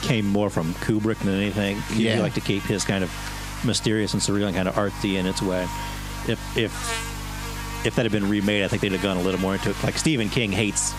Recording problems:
squashed, flat; heavily
electrical hum; loud; throughout; 50 Hz, 8 dB below the speech

